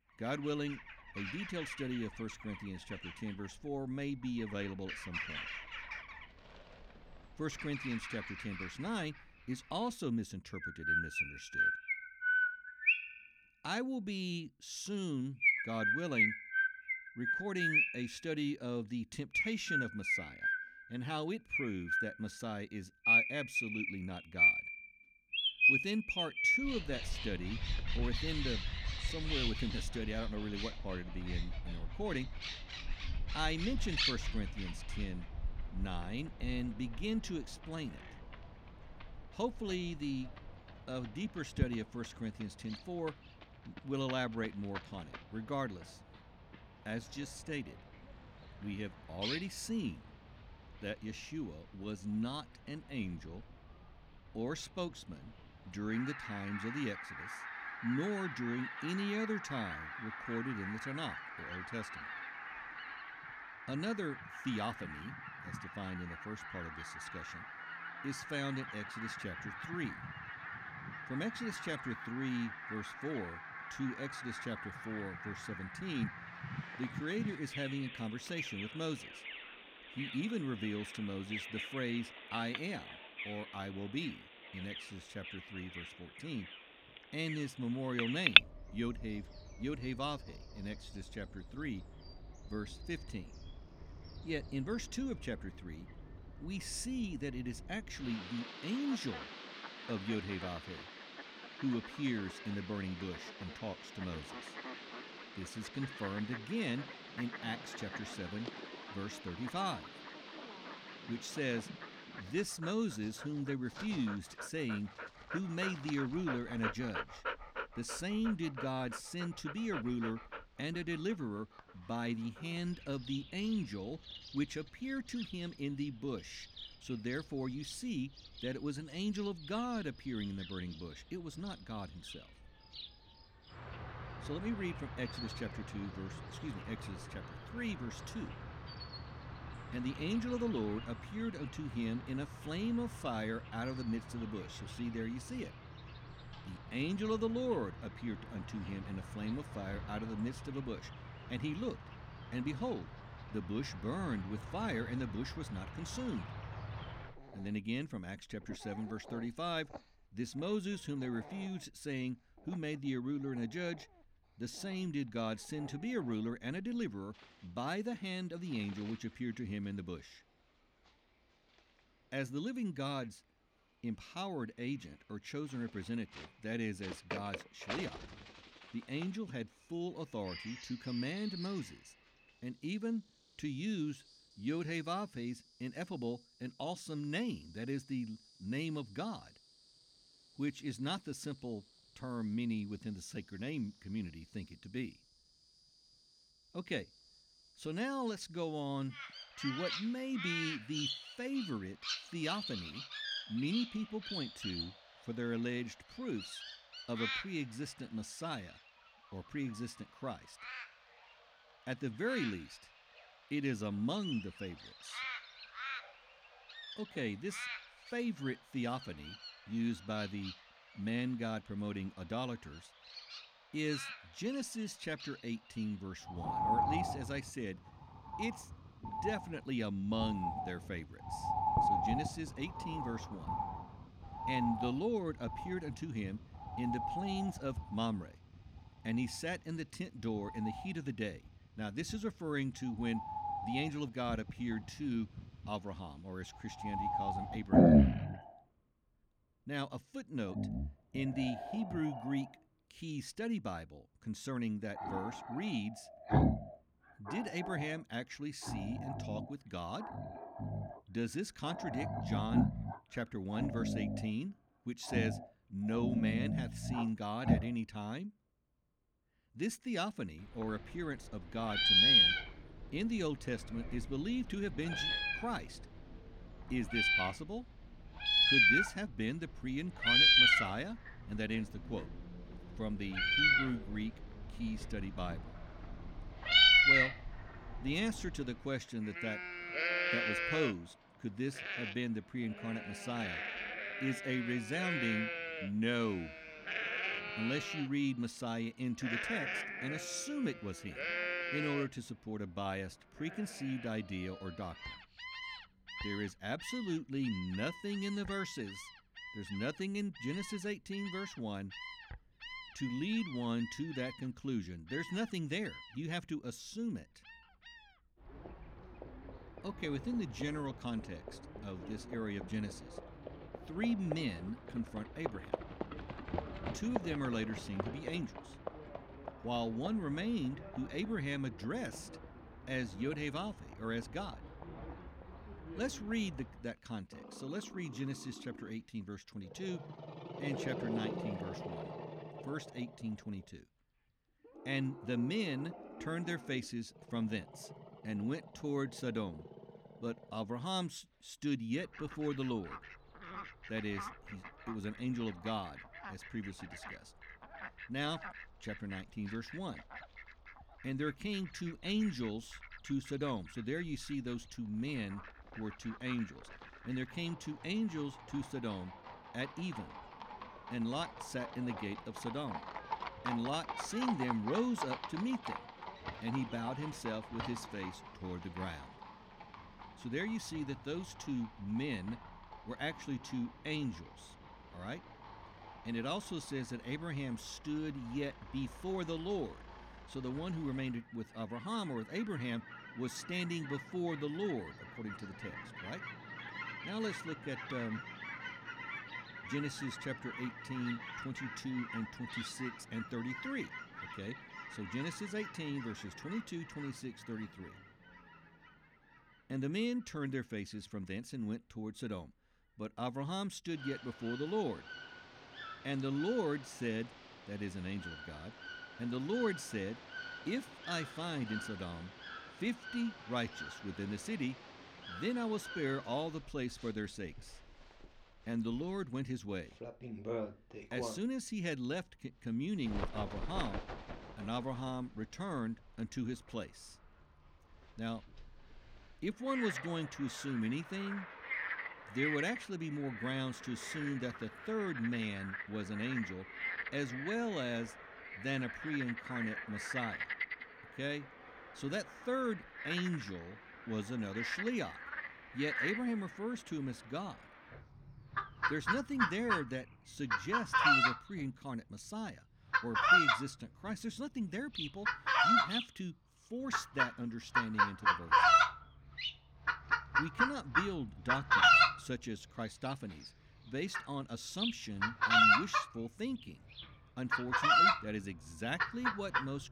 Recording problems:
animal sounds; very loud; throughout; 4 dB above the speech

